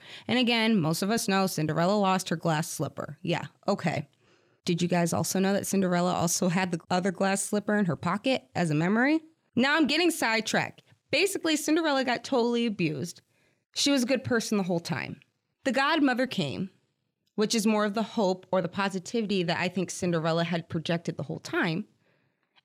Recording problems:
none

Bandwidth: 17.5 kHz